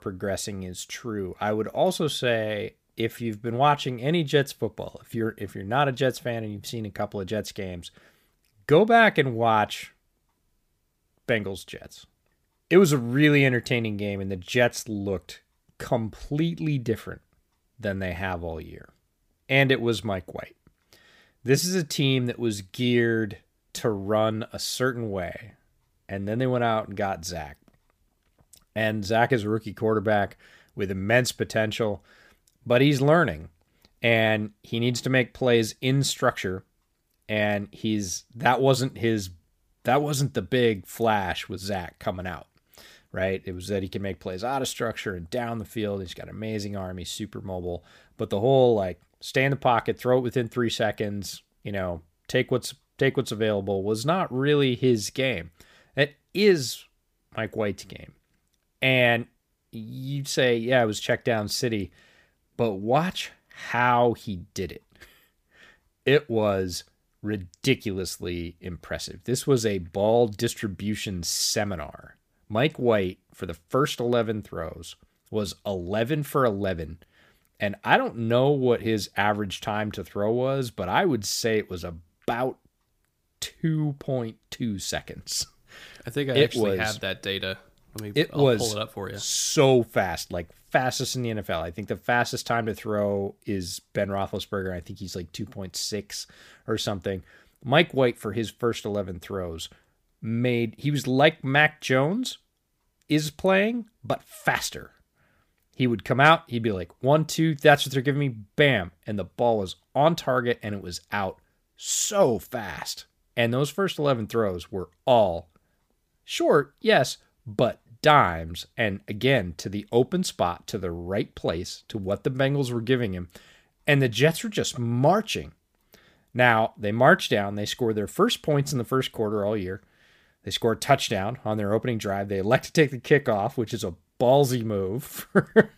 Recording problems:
none

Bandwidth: 15 kHz